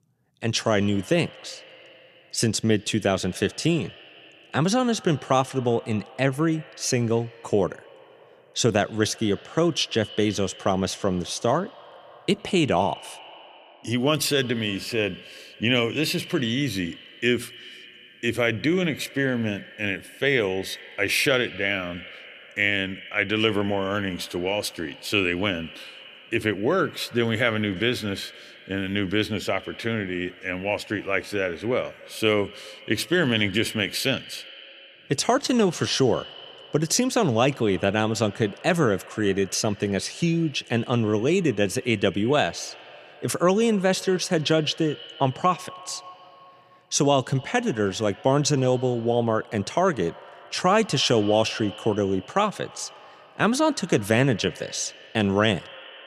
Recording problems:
echo of what is said; faint; throughout; 100 ms later, 20 dB below the speech

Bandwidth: 14.5 kHz